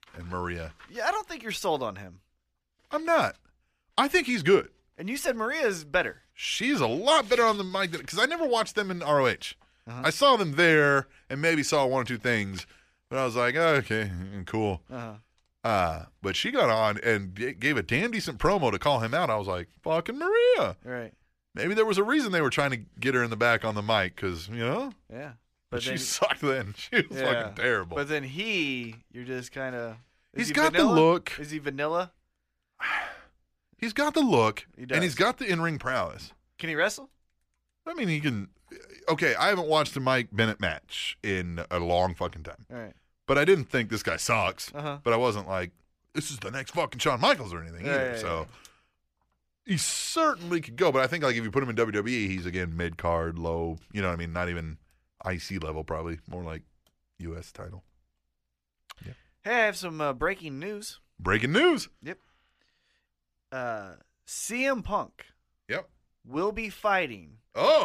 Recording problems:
abrupt cut into speech; at the end

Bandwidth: 14.5 kHz